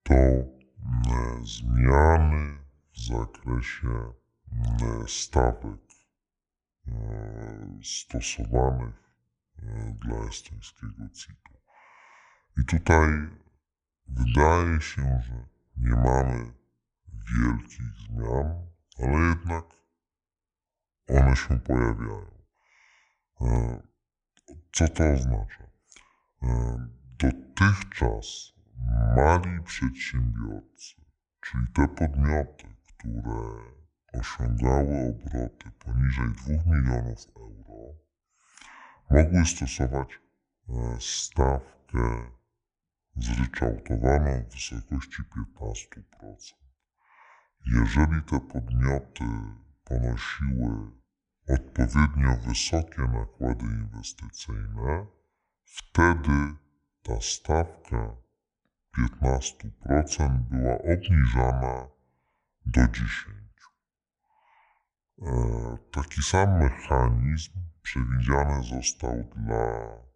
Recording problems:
wrong speed and pitch; too slow and too low; 0.6 times normal speed

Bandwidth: 10.5 kHz